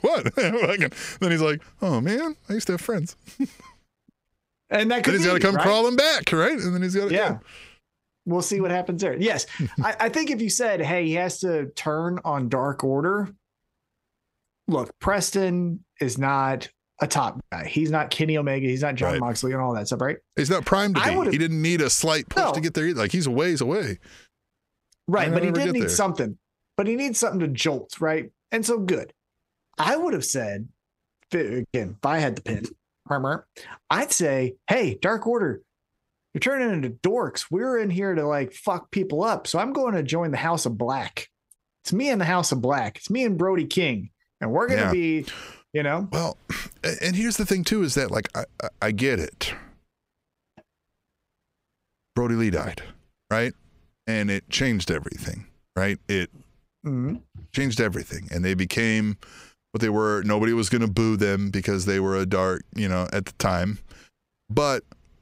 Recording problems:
squashed, flat; heavily

